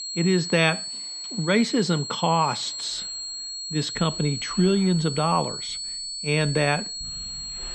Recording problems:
muffled; slightly; fading above 3 kHz
high-pitched whine; loud; throughout; 4.5 kHz, 7 dB below the speech
household noises; faint; throughout; 30 dB below the speech

